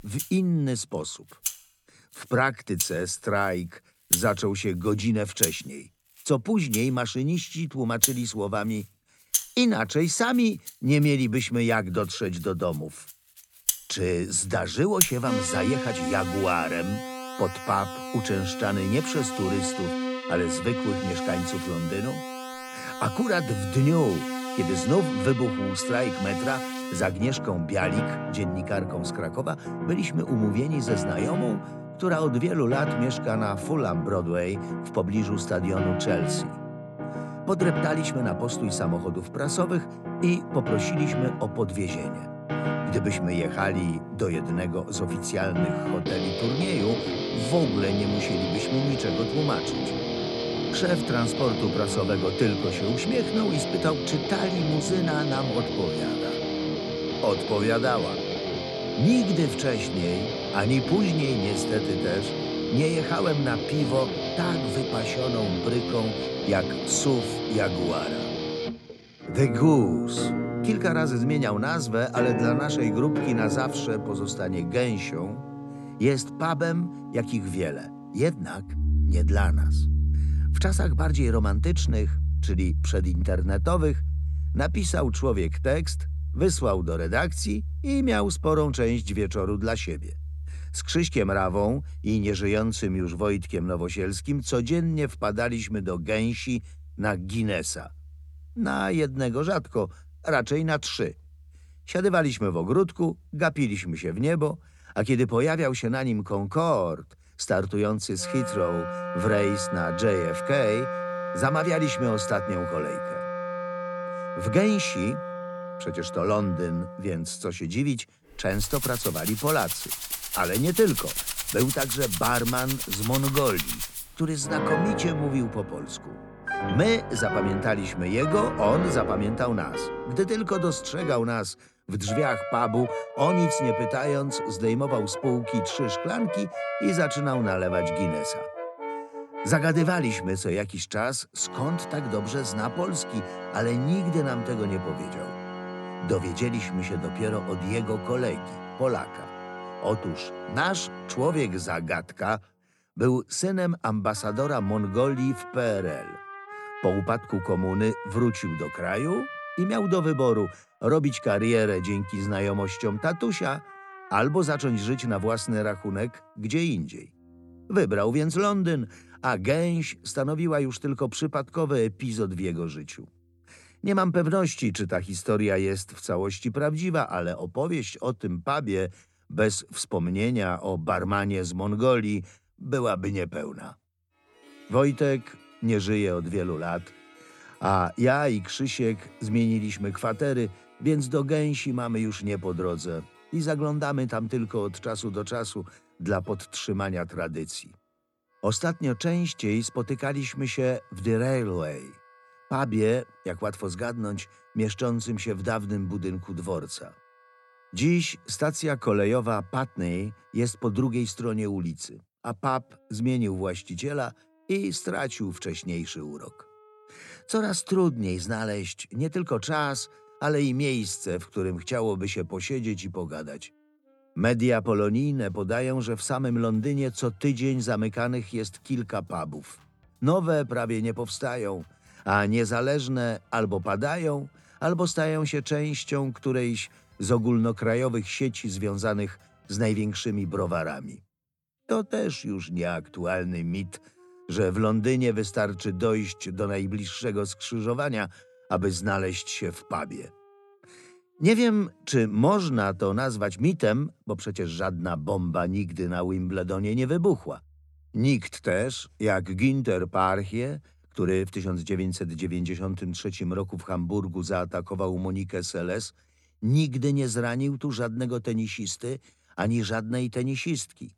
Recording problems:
background music; loud; throughout; 4 dB below the speech

